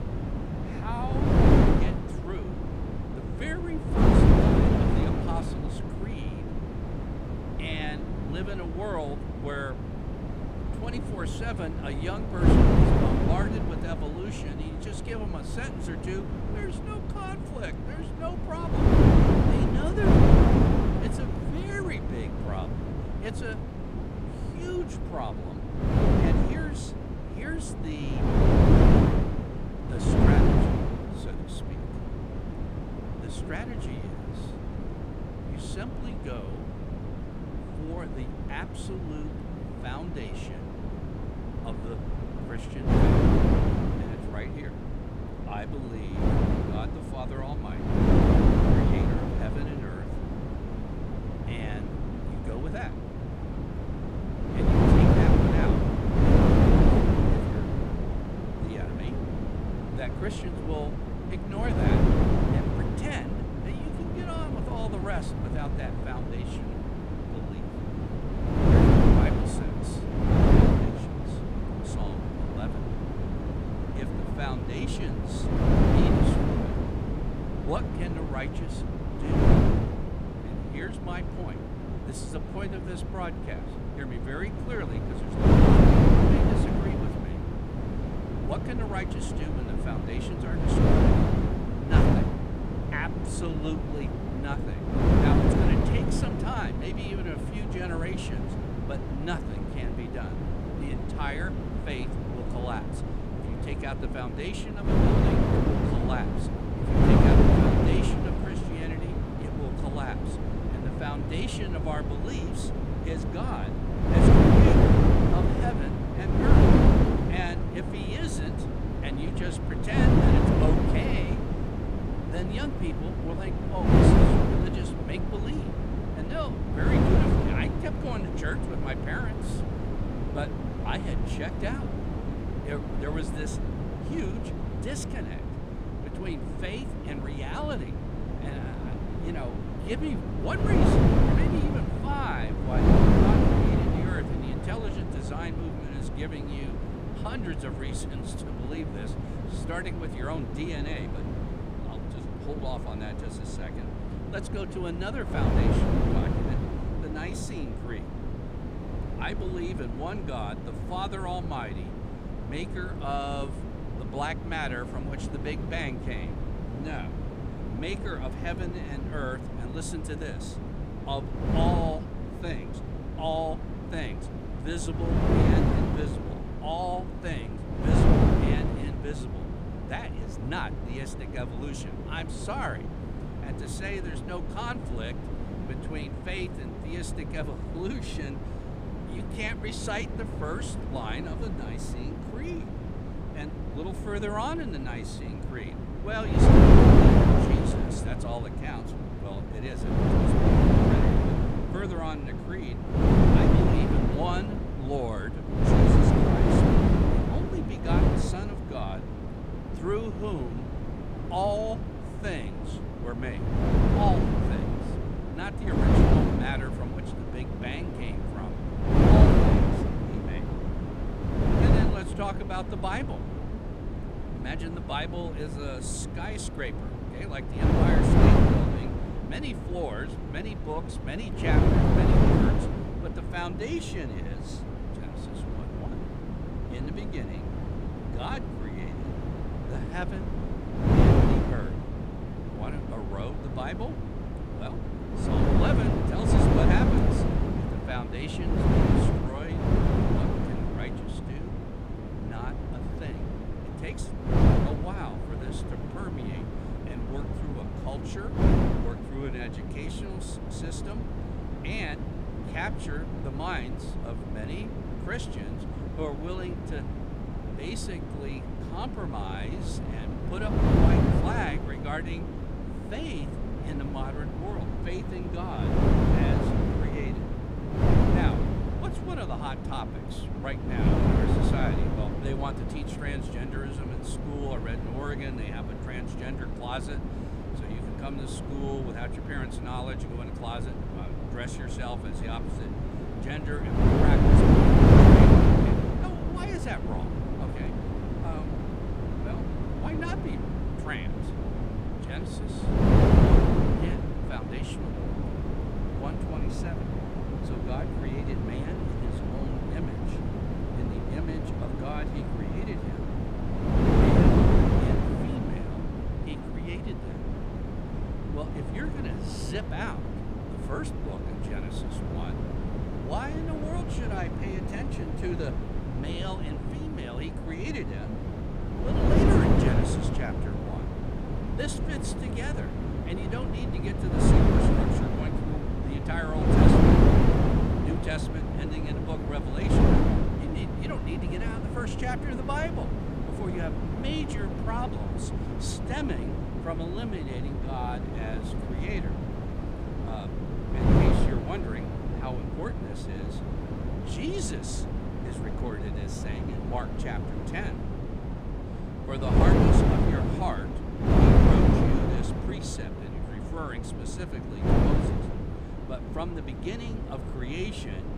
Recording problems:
wind noise on the microphone; heavy; 4 dB above the speech

